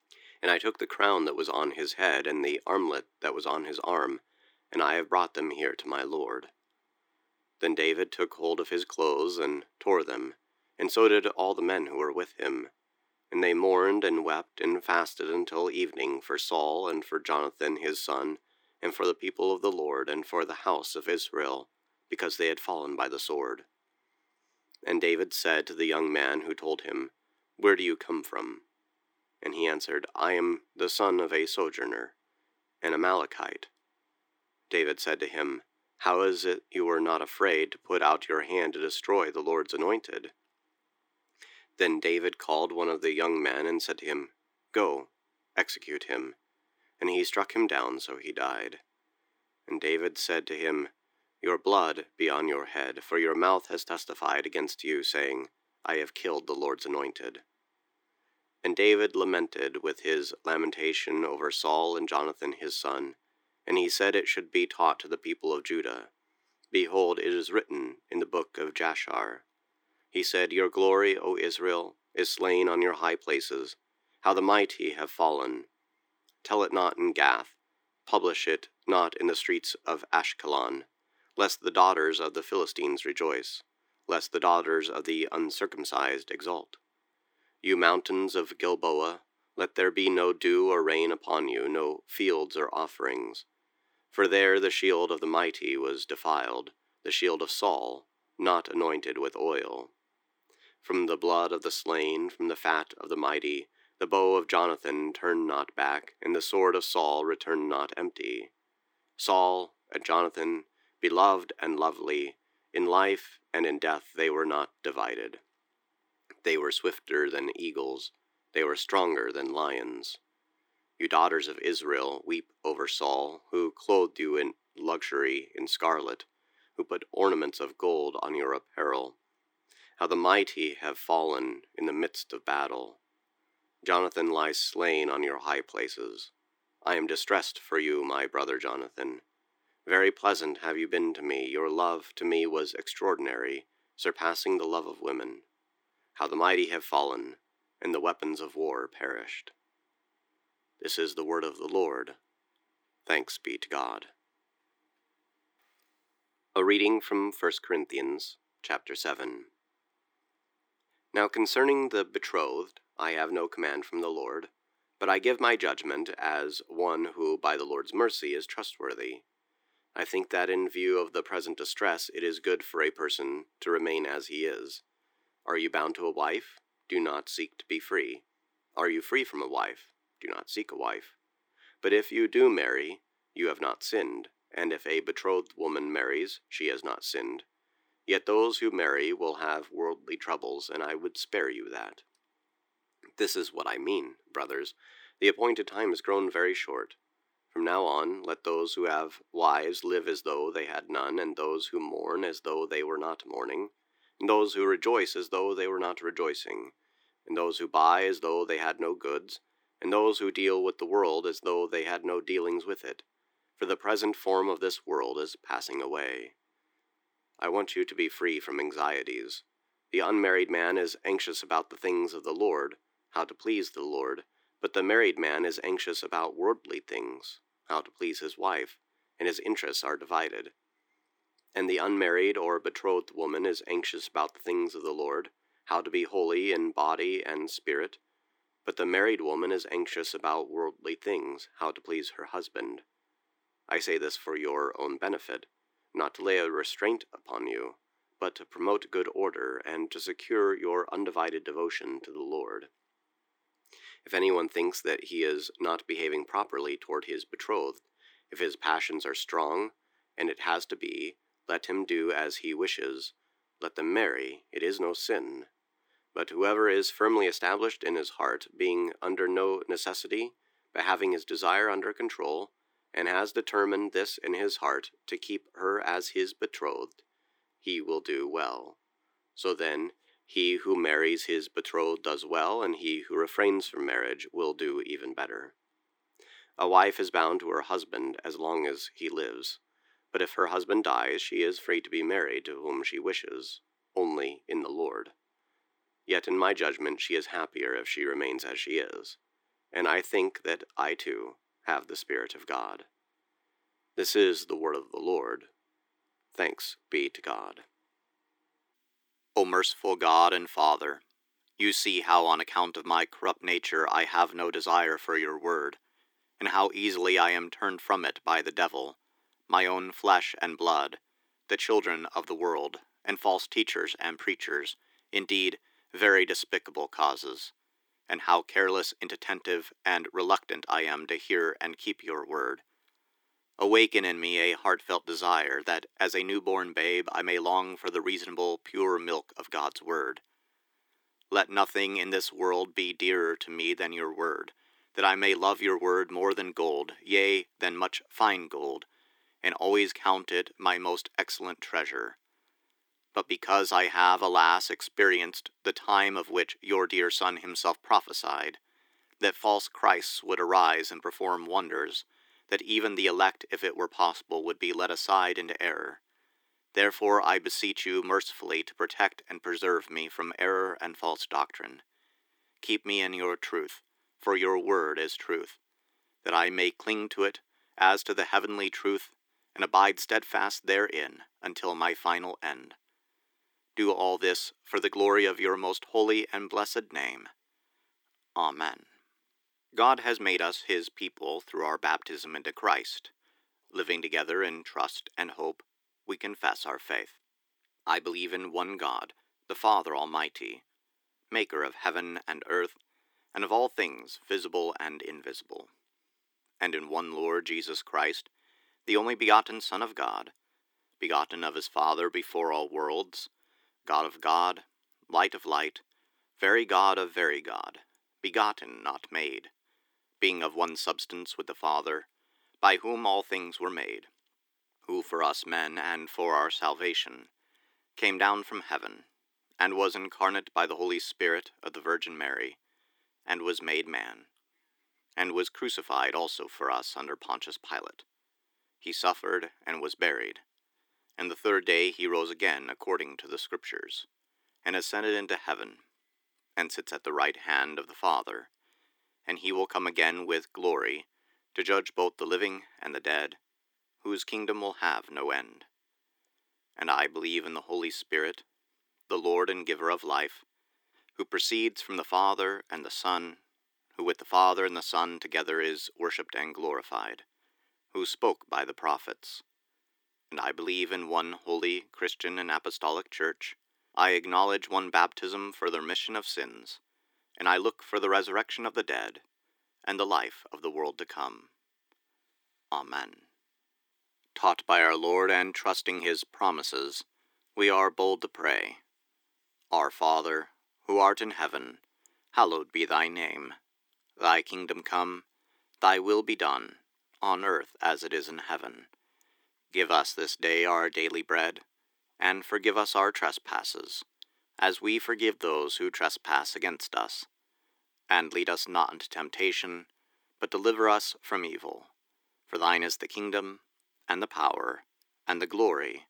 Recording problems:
thin; very; fading below 300 Hz

